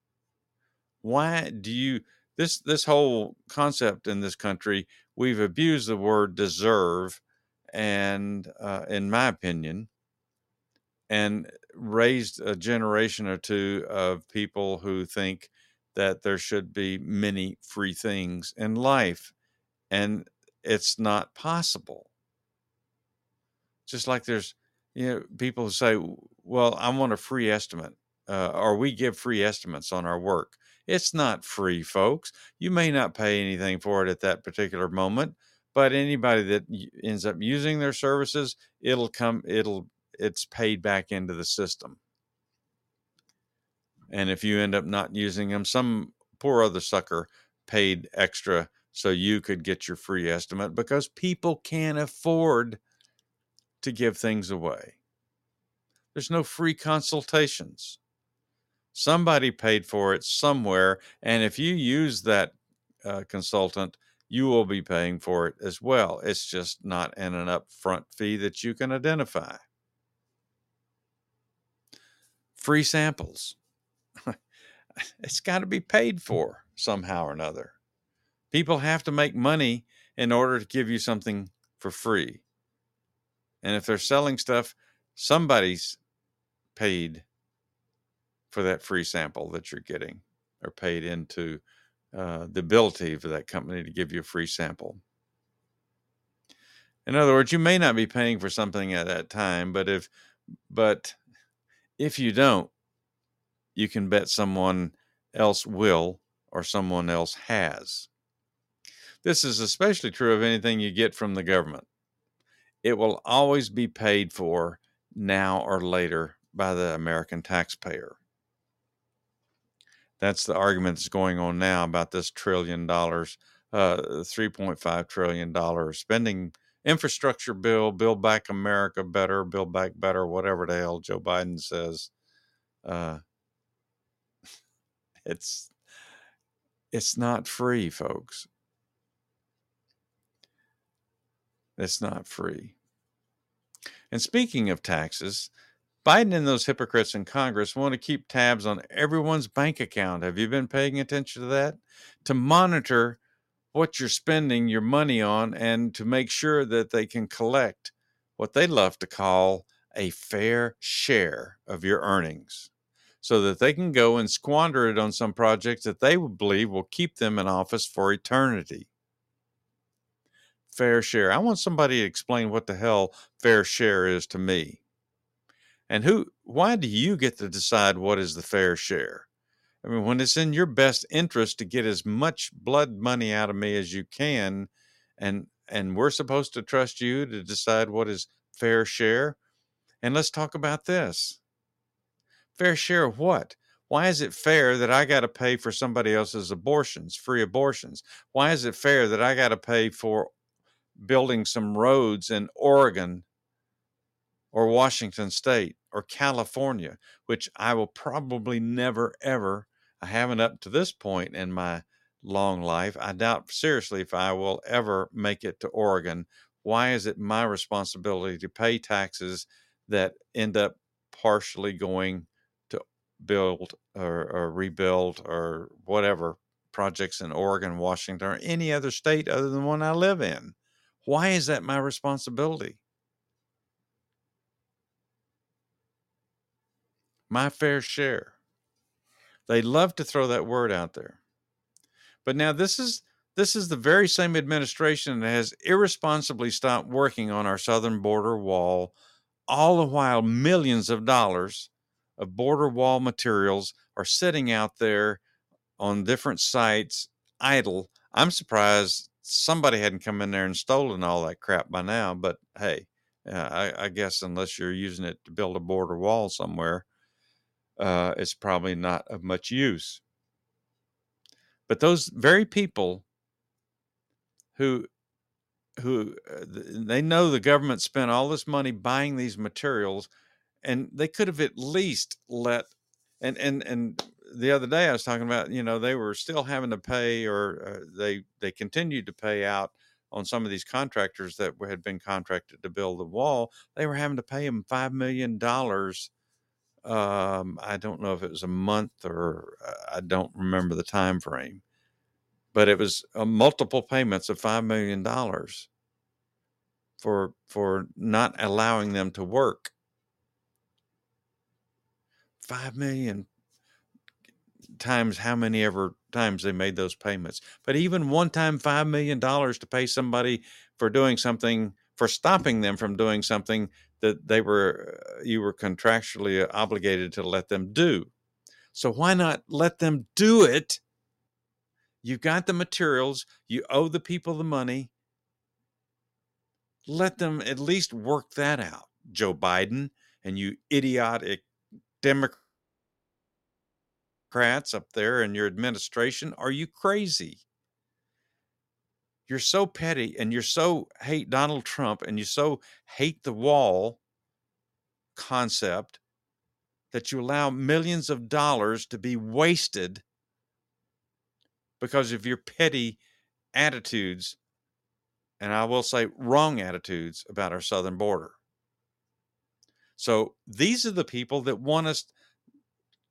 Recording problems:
none

